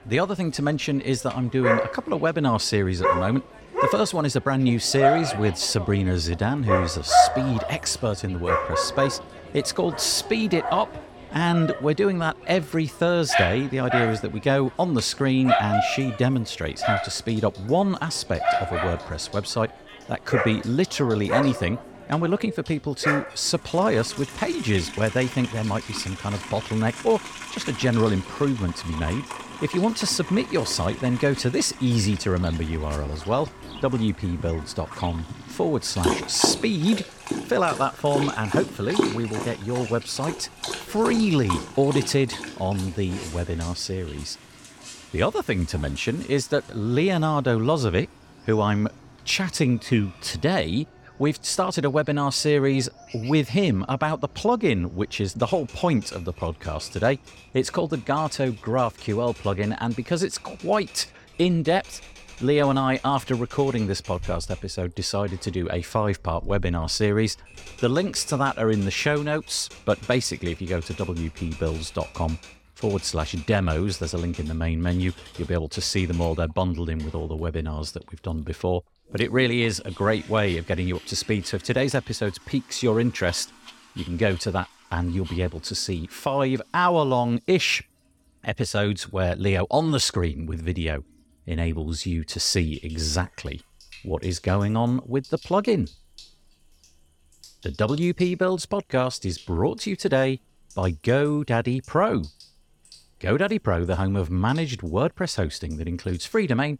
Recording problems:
animal sounds; loud; throughout; 5 dB below the speech
household noises; faint; throughout; 25 dB below the speech

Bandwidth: 17 kHz